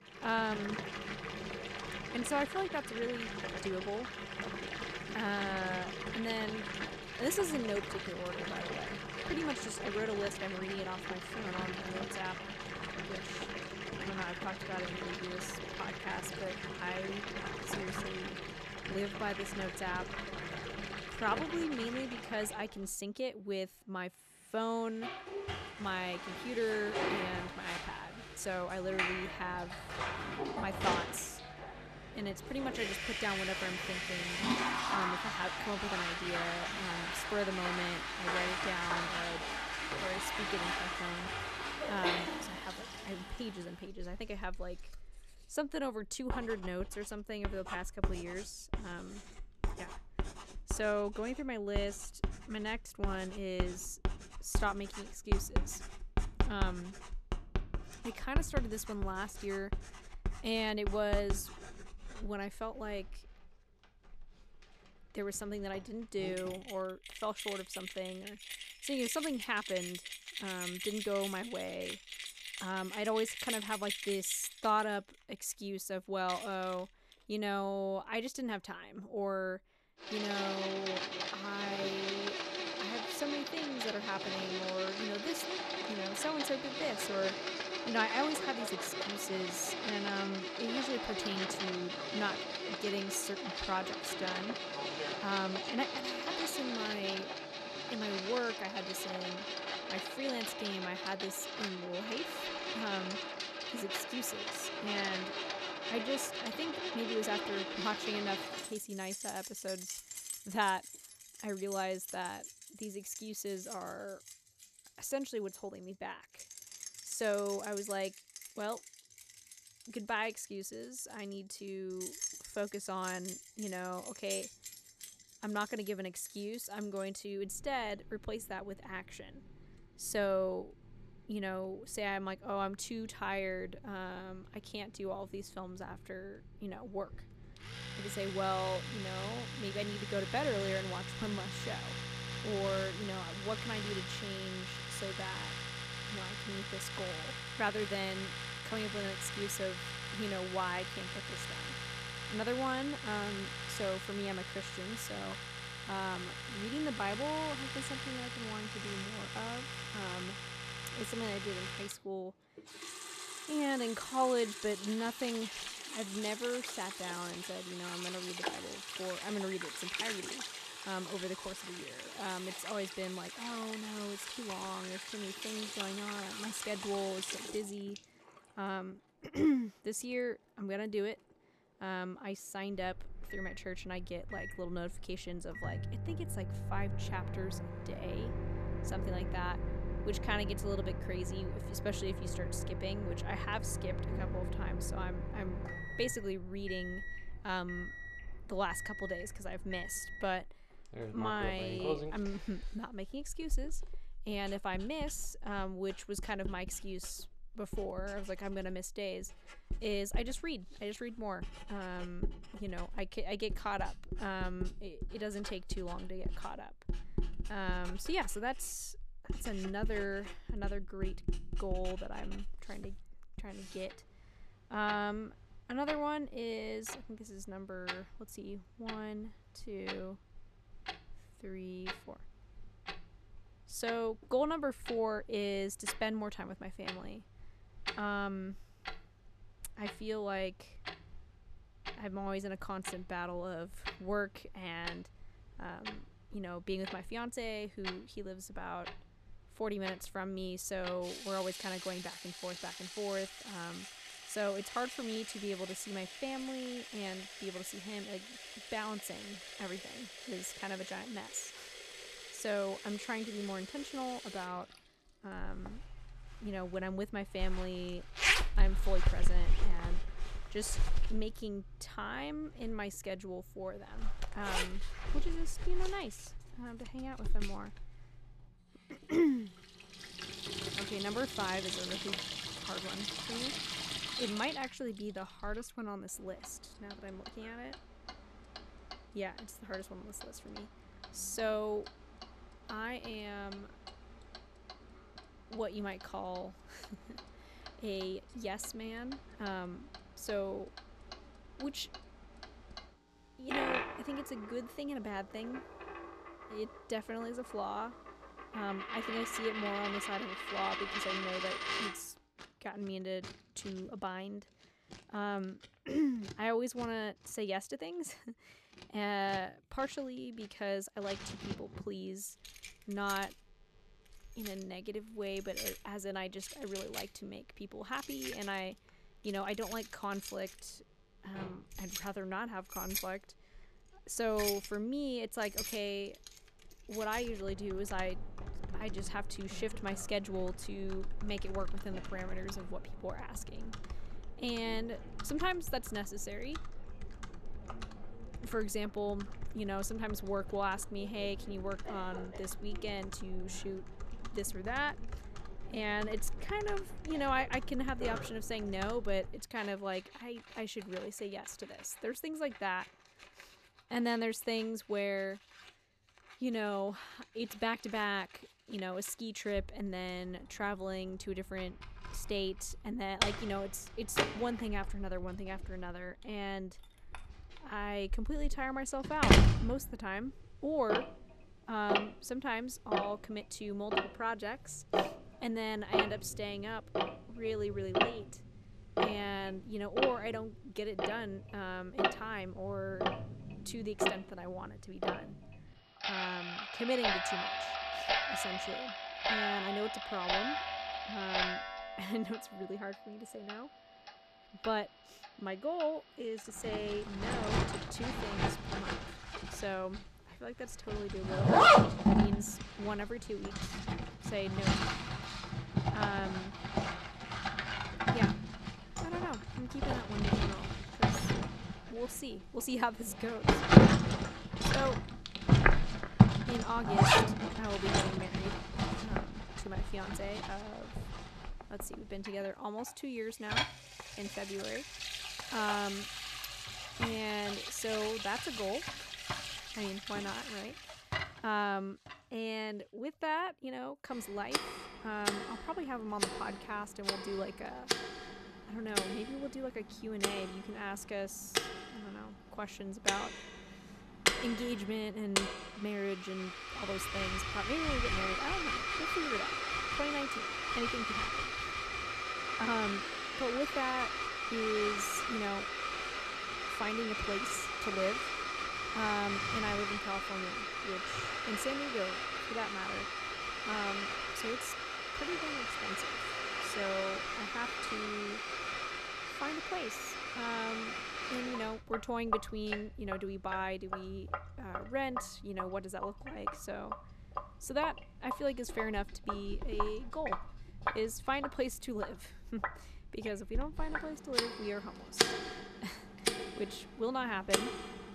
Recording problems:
household noises; very loud; throughout; 2 dB above the speech

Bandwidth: 14 kHz